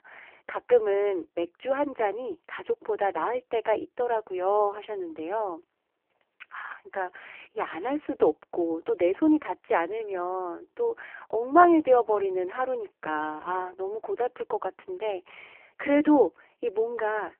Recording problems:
phone-call audio; poor line

